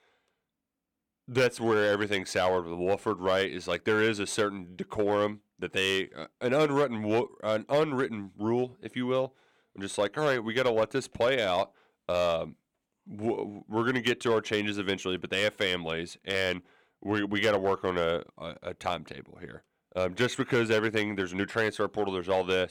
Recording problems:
none

